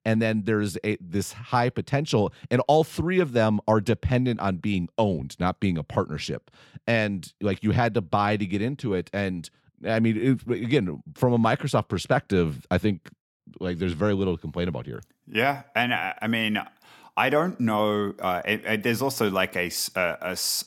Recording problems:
none

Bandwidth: 18 kHz